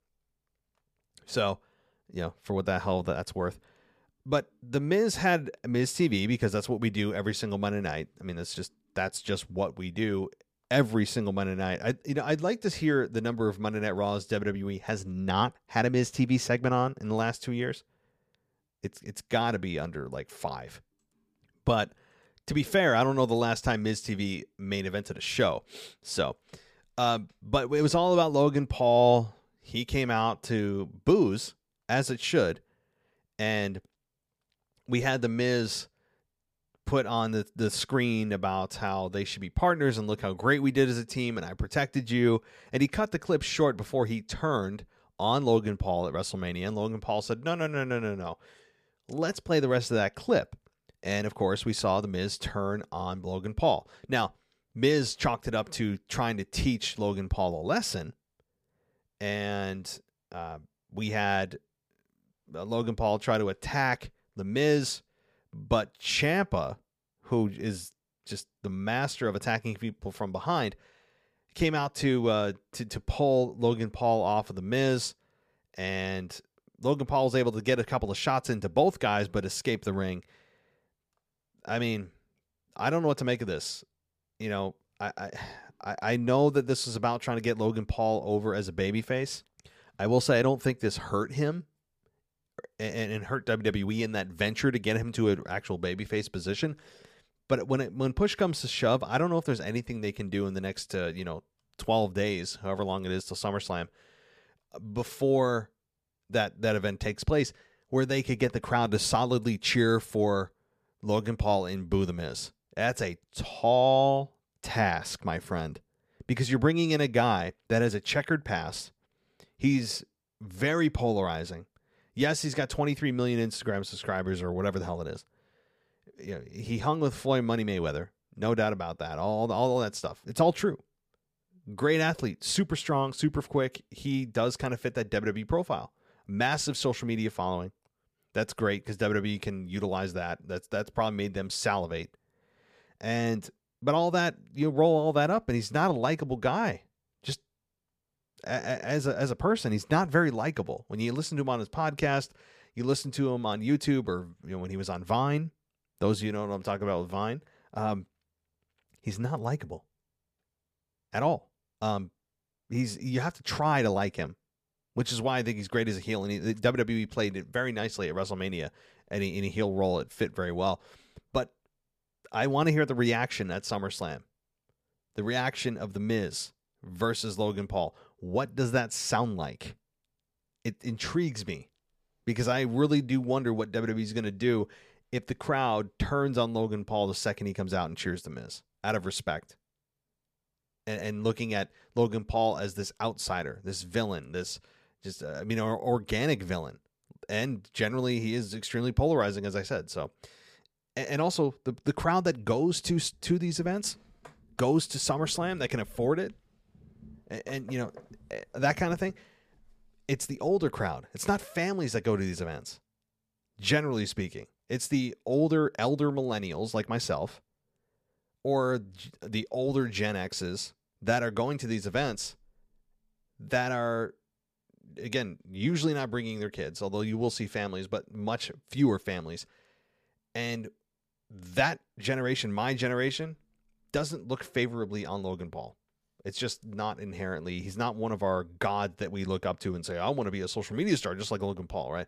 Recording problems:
none

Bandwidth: 15 kHz